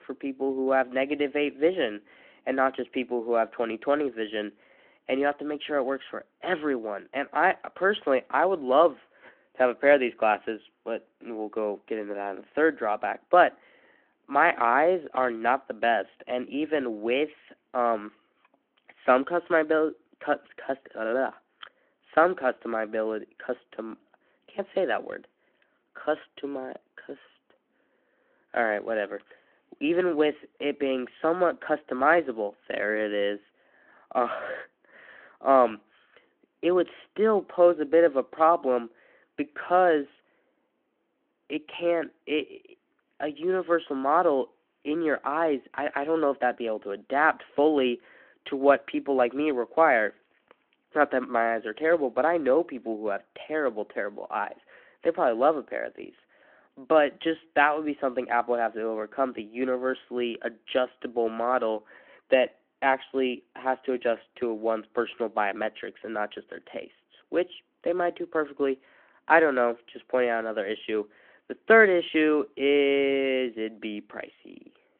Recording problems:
phone-call audio

